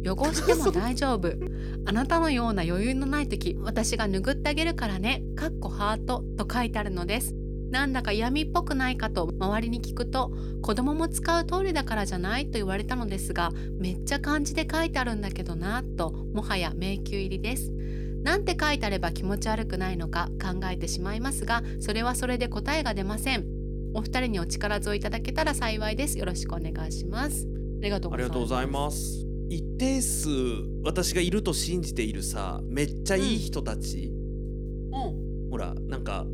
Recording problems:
electrical hum; noticeable; throughout; 50 Hz, 15 dB below the speech

